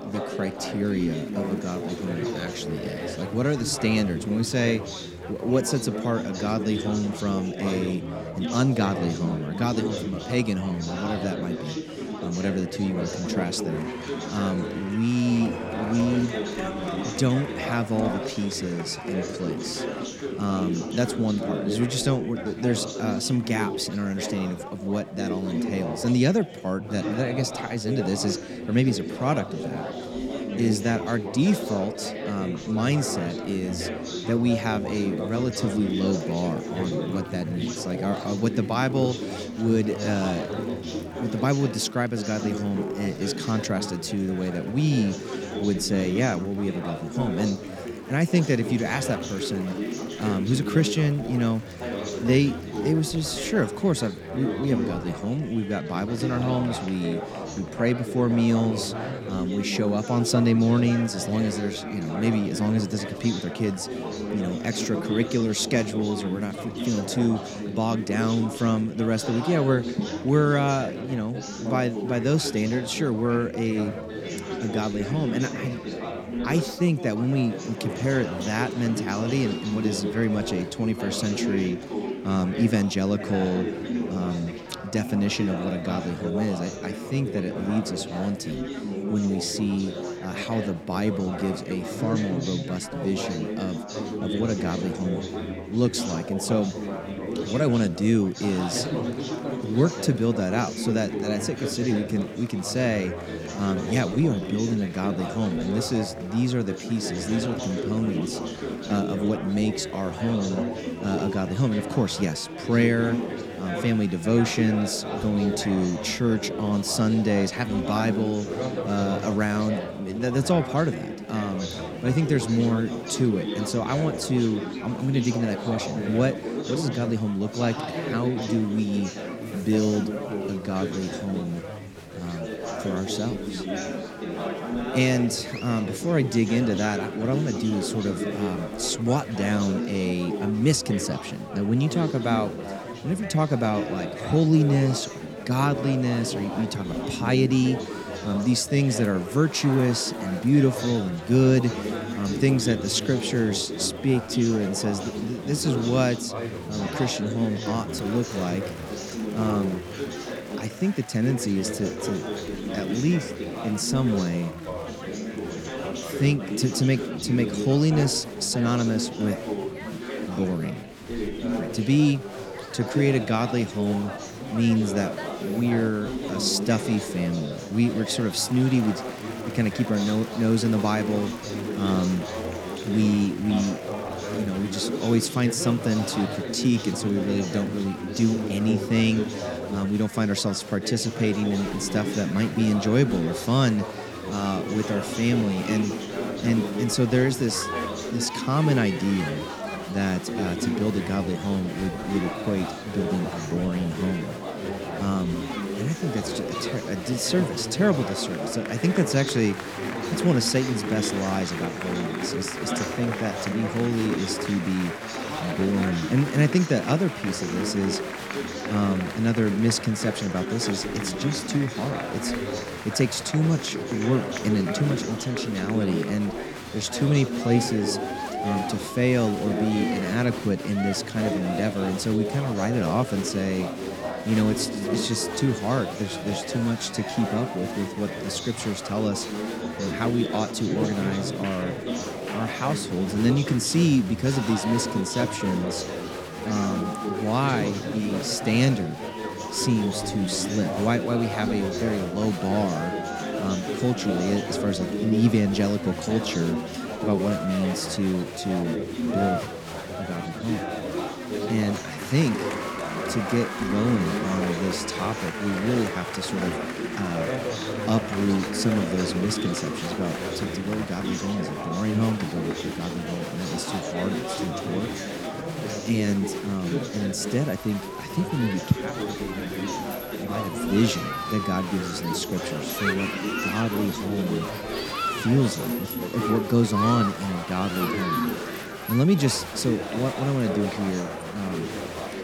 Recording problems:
chatter from many people; loud; throughout; 5 dB below the speech

